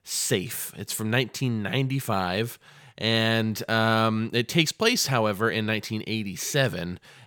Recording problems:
none

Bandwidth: 18 kHz